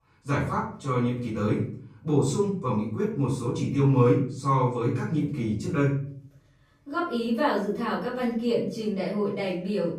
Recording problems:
off-mic speech; far
room echo; noticeable; dies away in 0.5 s

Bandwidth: 15.5 kHz